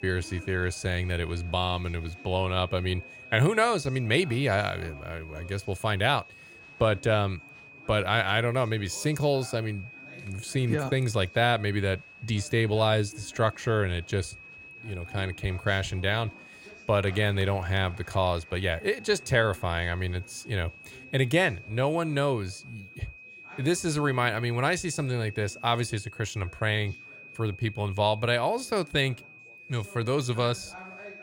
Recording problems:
high-pitched whine; noticeable; throughout; 2.5 kHz, 20 dB below the speech
chatter from many people; faint; throughout; 25 dB below the speech

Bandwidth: 16 kHz